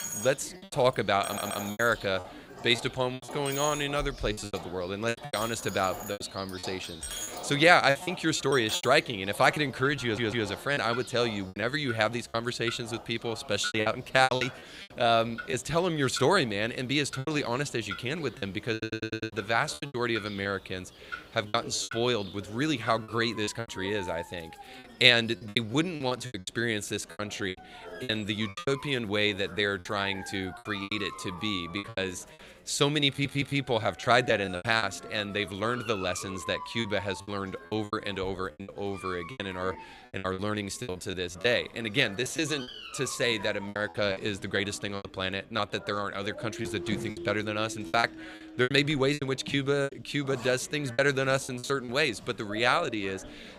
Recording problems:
animal sounds; noticeable; throughout; 15 dB below the speech
household noises; noticeable; throughout; 15 dB below the speech
chatter from many people; faint; throughout; 25 dB below the speech
choppy; very; 11% of the speech affected
audio stuttering; 4 times, first at 1.5 s

